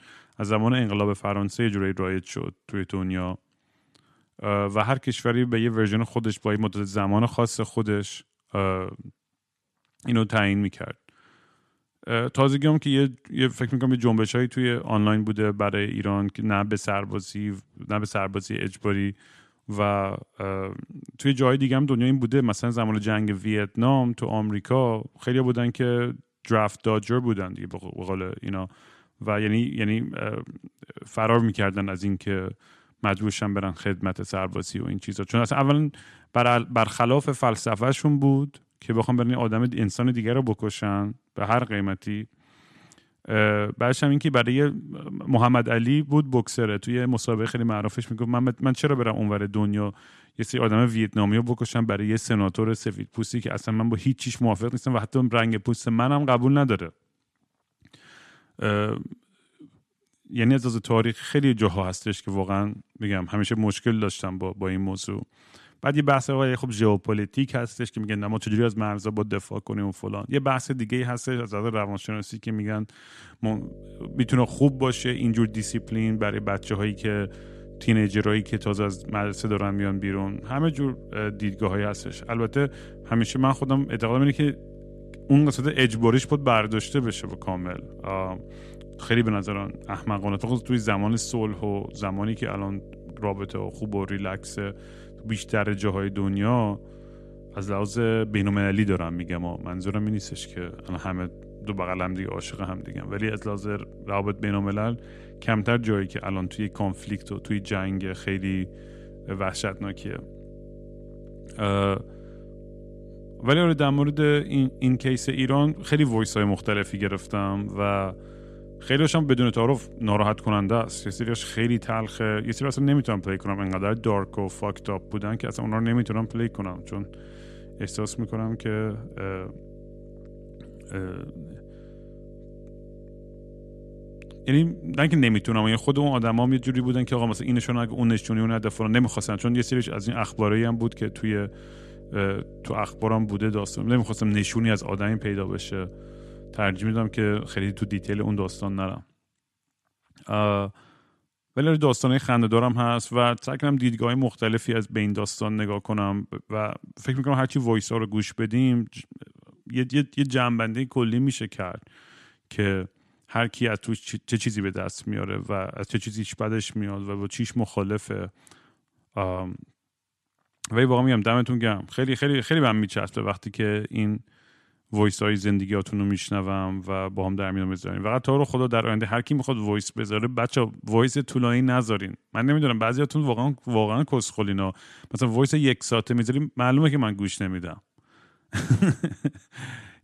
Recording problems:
electrical hum; faint; from 1:13 to 2:29; 50 Hz, 20 dB below the speech

